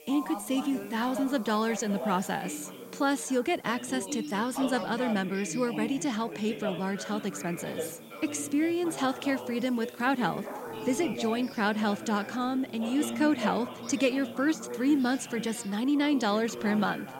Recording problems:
background chatter; loud; throughout; 4 voices, 10 dB below the speech
hiss; faint; throughout; 25 dB below the speech
dog barking; faint; at 10 s; peak 10 dB below the speech

